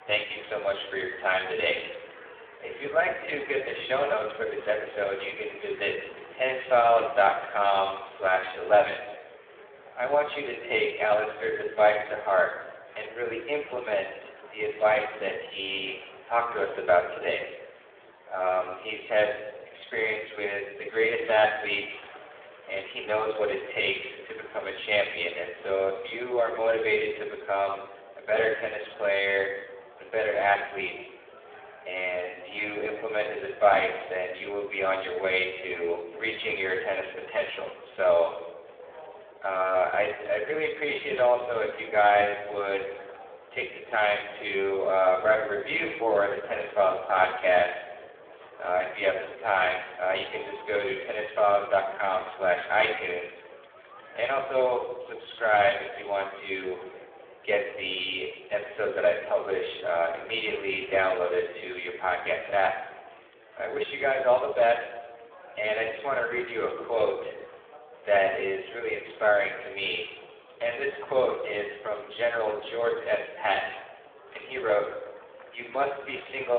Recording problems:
phone-call audio; poor line
off-mic speech; far
room echo; noticeable; dies away in 0.9 s
murmuring crowd; faint; throughout; 20 dB below the speech
abrupt cut into speech; at the end

